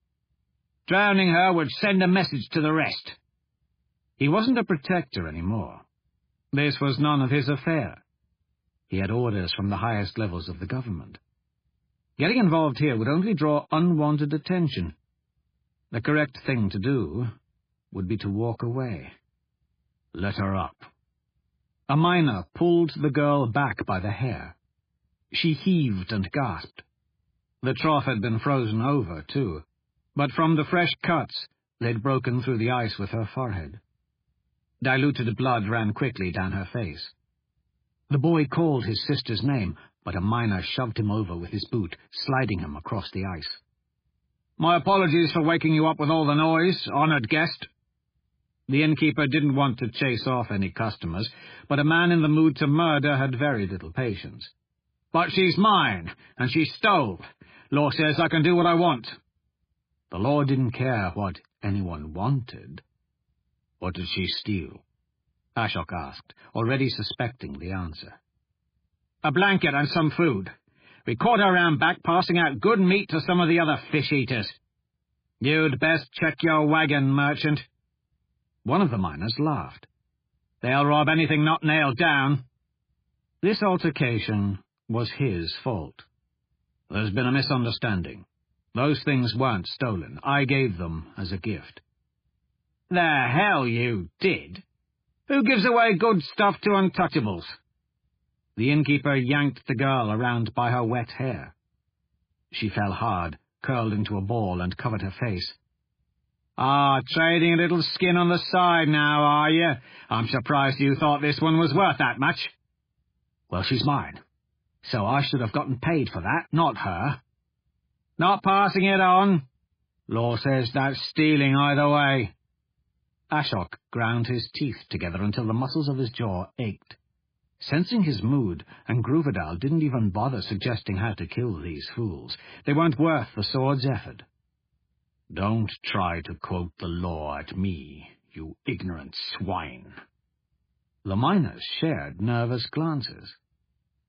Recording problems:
garbled, watery; badly; nothing above 4.5 kHz

